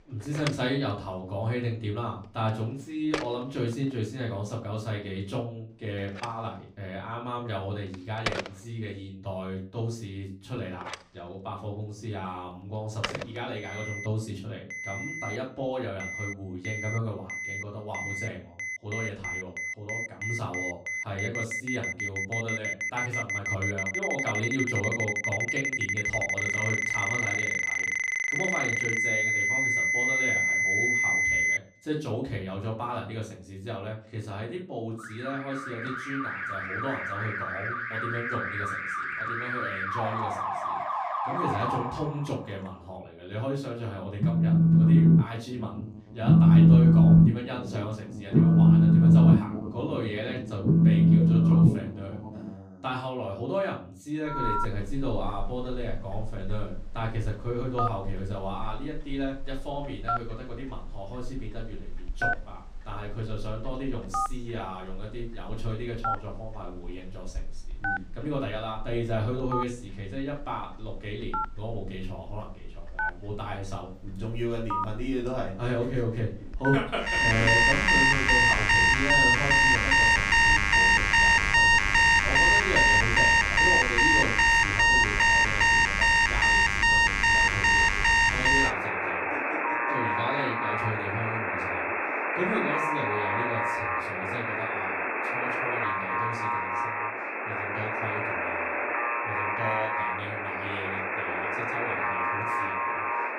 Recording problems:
off-mic speech; far
room echo; slight; dies away in 0.3 s
alarms or sirens; very loud; throughout; 10 dB above the speech

